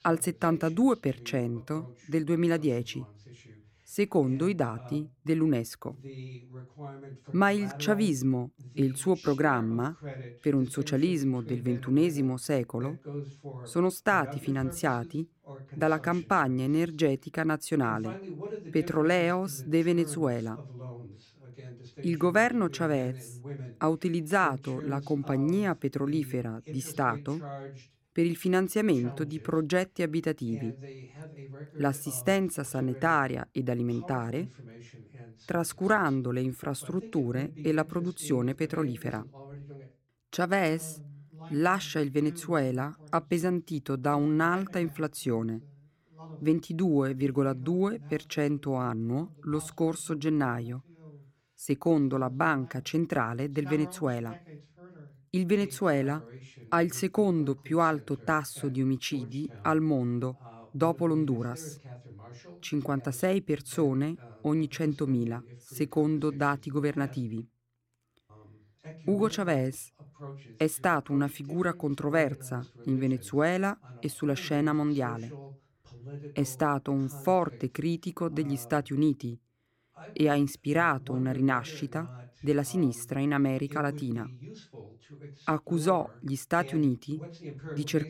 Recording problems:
voice in the background; noticeable; throughout; 15 dB below the speech

